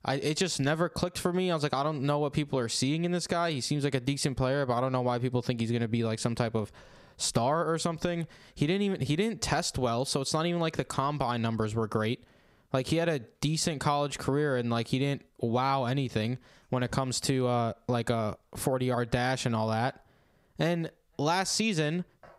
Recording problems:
squashed, flat; heavily

